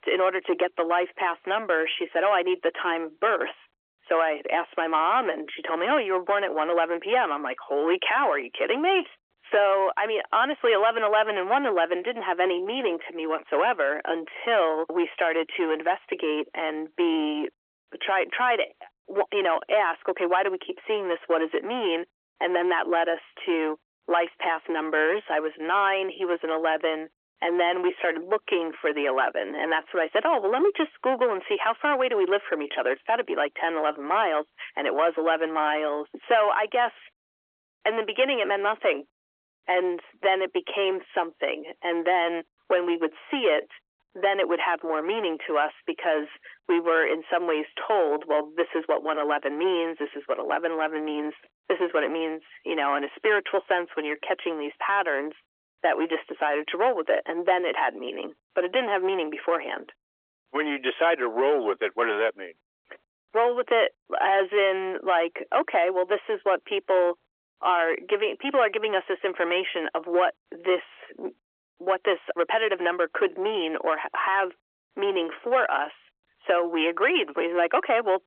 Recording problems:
phone-call audio; nothing above 3.5 kHz
distortion; slight; 10 dB below the speech

